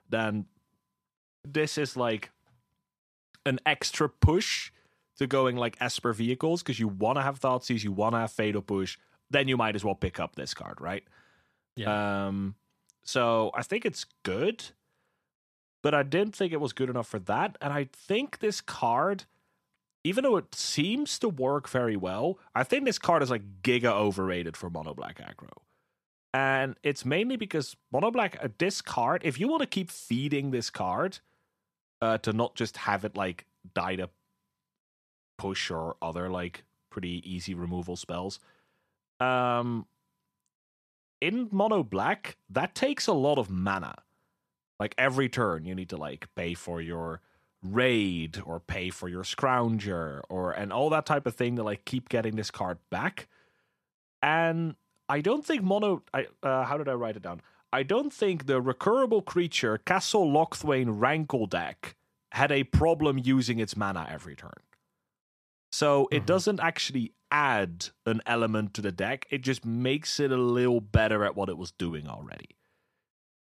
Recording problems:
none

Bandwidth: 14.5 kHz